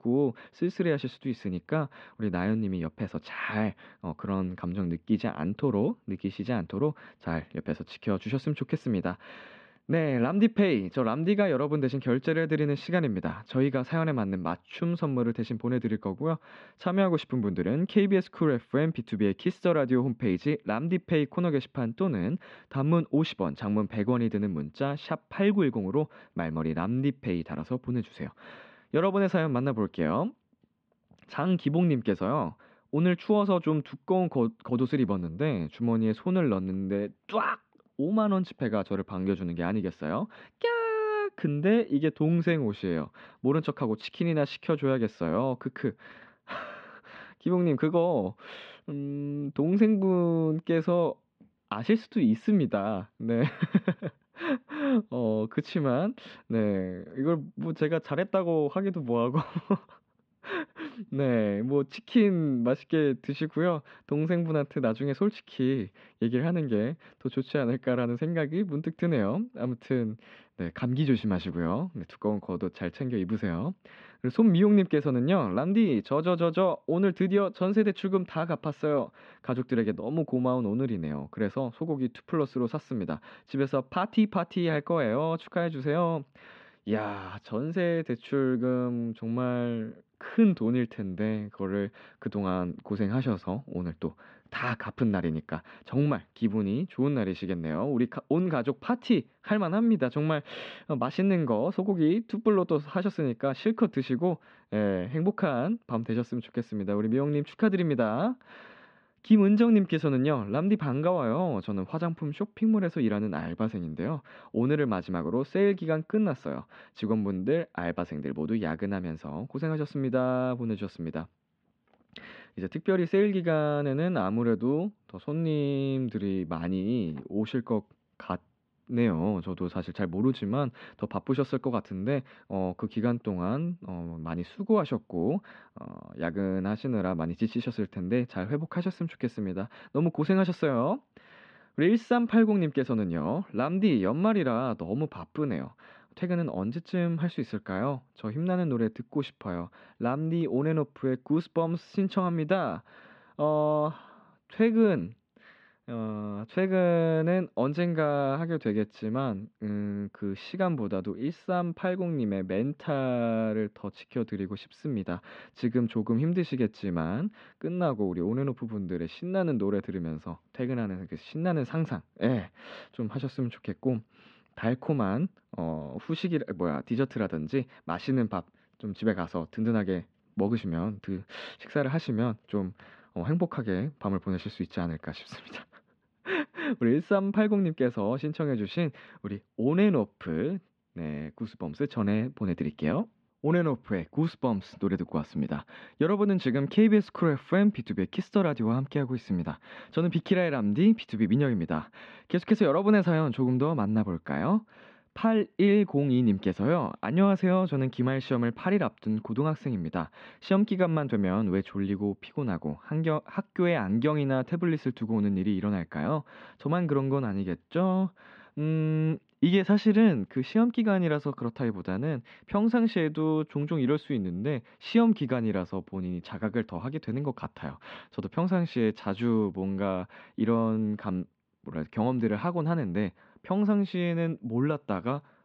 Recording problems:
muffled; slightly; fading above 3 kHz

